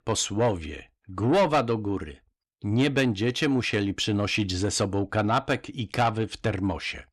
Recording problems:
distortion; slight; 10 dB below the speech

